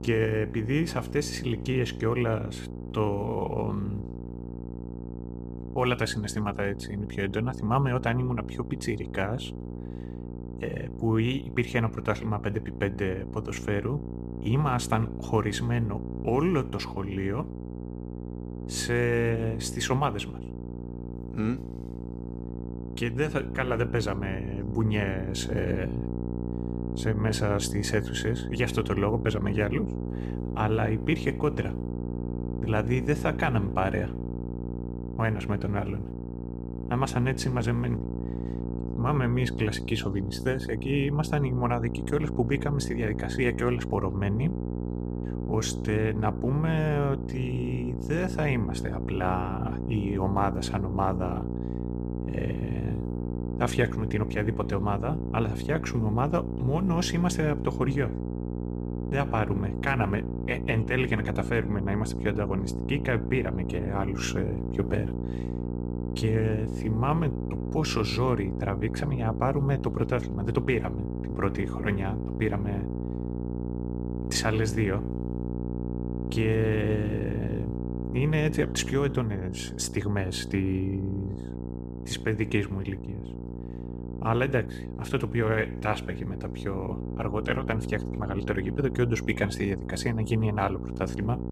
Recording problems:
electrical hum; loud; throughout; 60 Hz, 9 dB below the speech

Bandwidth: 14.5 kHz